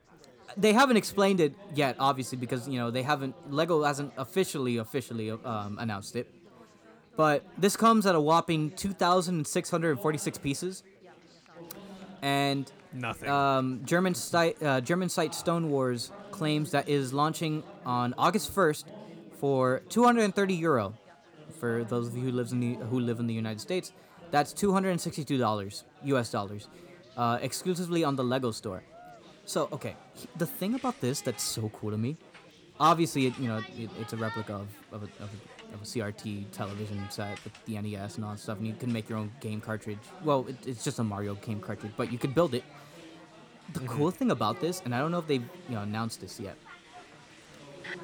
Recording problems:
chatter from many people; noticeable; throughout; 20 dB below the speech

